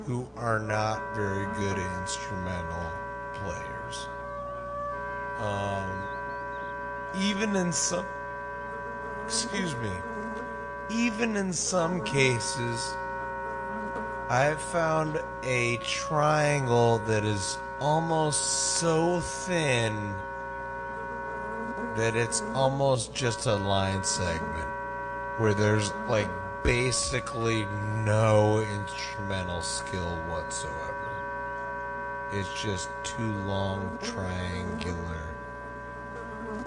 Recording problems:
wrong speed, natural pitch; too slow; 0.5 times normal speed
garbled, watery; slightly; nothing above 9 kHz
background music; loud; throughout; 7 dB below the speech
electrical hum; noticeable; throughout; 60 Hz, 15 dB below the speech

